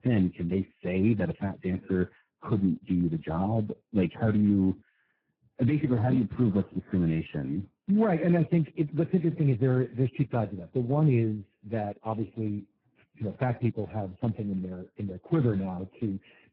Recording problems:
garbled, watery; badly; nothing above 5.5 kHz

